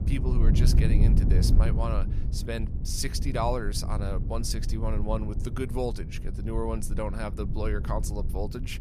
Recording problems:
low rumble; loud; throughout; 8 dB below the speech

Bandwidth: 14.5 kHz